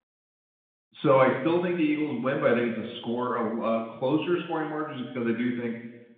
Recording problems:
room echo; noticeable; dies away in 1 s
phone-call audio; nothing above 3.5 kHz
off-mic speech; somewhat distant

